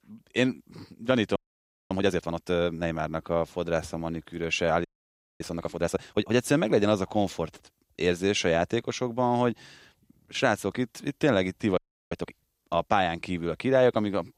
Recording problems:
audio freezing; at 1.5 s for 0.5 s, at 5 s for 0.5 s and at 12 s

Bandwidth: 15.5 kHz